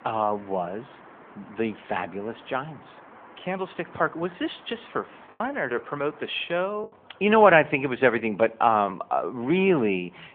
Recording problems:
phone-call audio; nothing above 3.5 kHz
traffic noise; faint; throughout; 25 dB below the speech
choppy; occasionally; from 5.5 to 7 s; 4% of the speech affected

